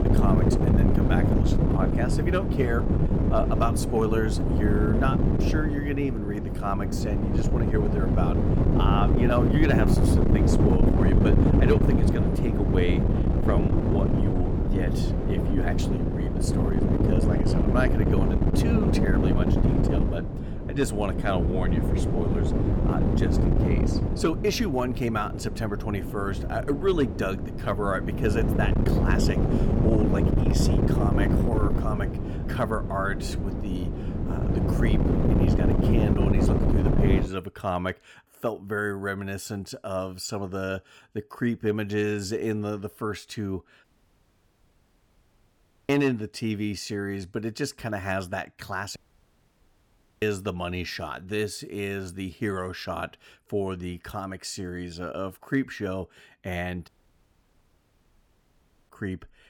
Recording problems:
wind noise on the microphone; heavy; until 37 s; as loud as the speech
audio cutting out; at 44 s for 2 s, at 49 s for 1.5 s and at 57 s for 2 s

